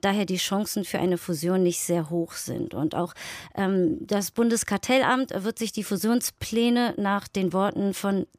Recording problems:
none

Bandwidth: 15 kHz